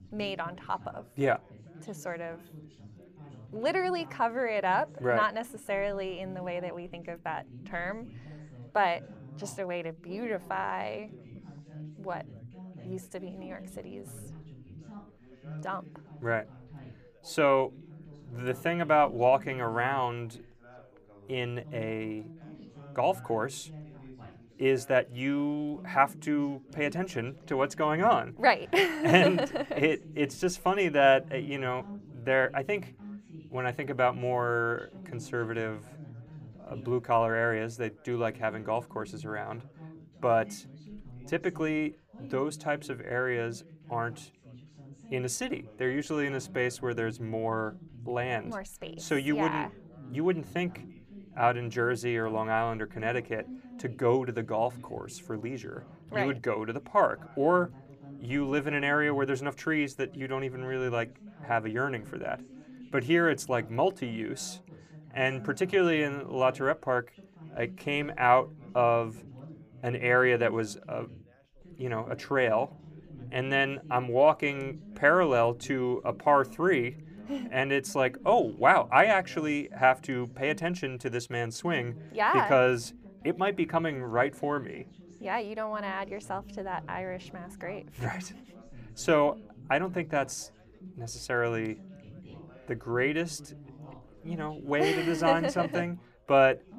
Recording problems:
background chatter; noticeable; throughout; 3 voices, 20 dB below the speech

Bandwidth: 15 kHz